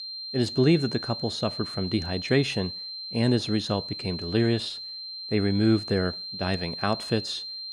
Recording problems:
high-pitched whine; loud; throughout; 4 kHz, 7 dB below the speech

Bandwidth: 15 kHz